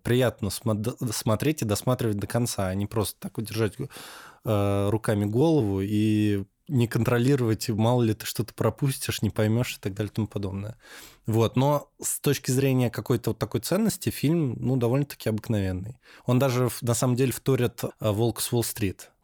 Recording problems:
none

